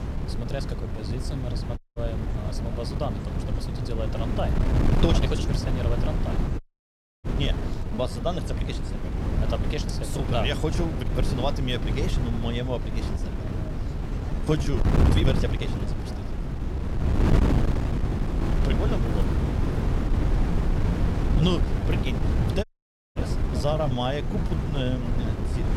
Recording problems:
wind noise on the microphone; heavy; 3 dB below the speech
wind in the background; noticeable; throughout; 15 dB below the speech
background chatter; noticeable; throughout; 3 voices, 20 dB below the speech
uneven, jittery; strongly; from 0.5 to 25 s
audio cutting out; at 2 s, at 6.5 s for 0.5 s and at 23 s for 0.5 s

